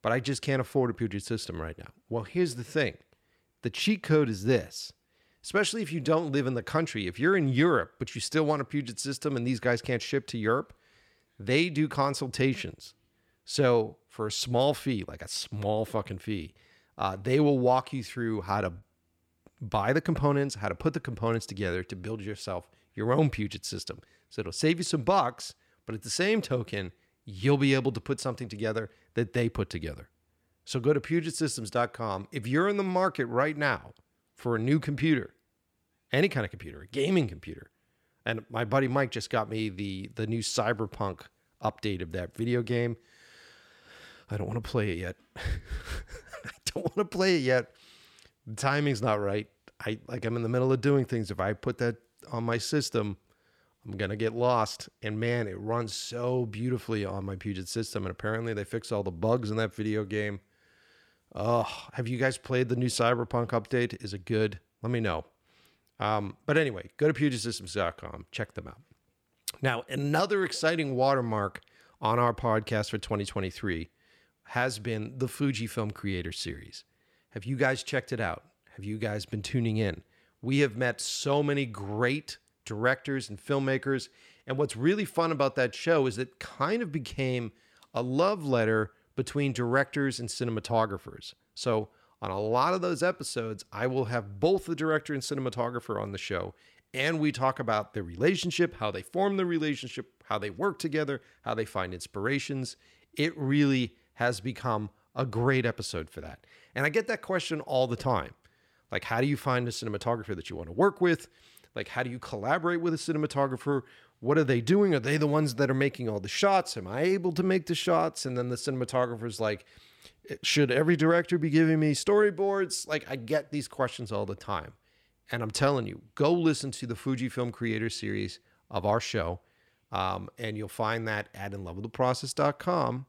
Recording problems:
choppy; occasionally; at 19 s; under 1% of the speech affected

